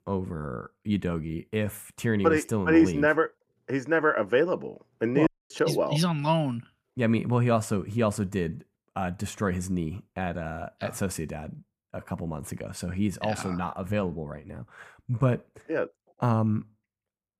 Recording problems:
audio cutting out; at 5.5 s

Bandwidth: 14.5 kHz